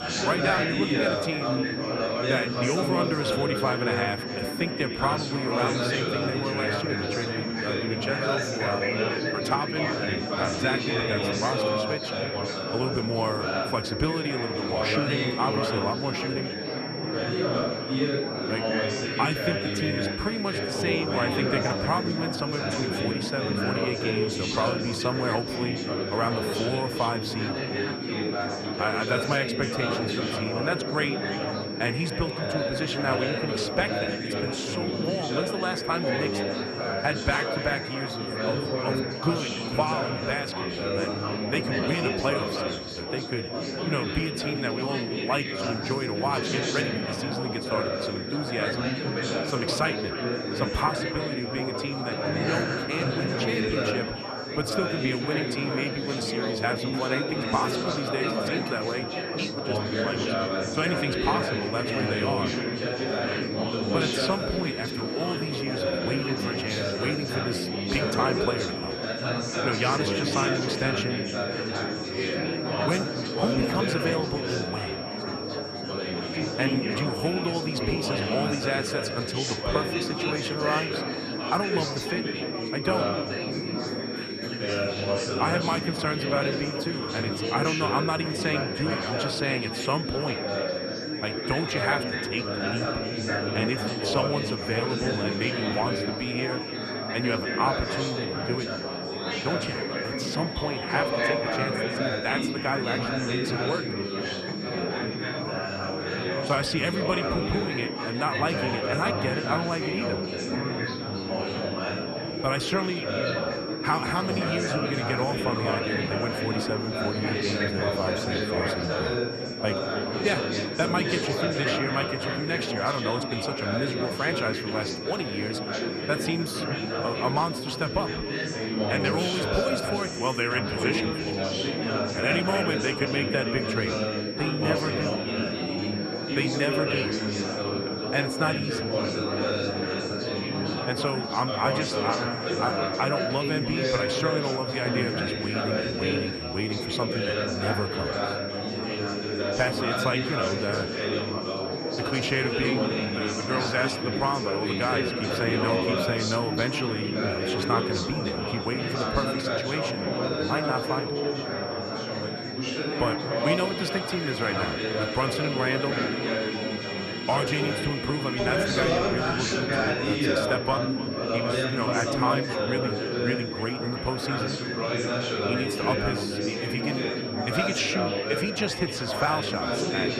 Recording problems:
echo of what is said; noticeable; throughout; 300 ms later, 15 dB below the speech
chatter from many people; very loud; throughout; 1 dB above the speech
high-pitched whine; loud; throughout; 5.5 kHz, 7 dB below the speech
background music; noticeable; throughout; 15 dB below the speech

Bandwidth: 14.5 kHz